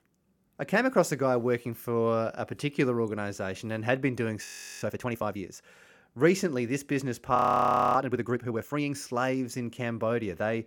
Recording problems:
audio freezing; at 4.5 s and at 7.5 s for 0.5 s

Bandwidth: 17.5 kHz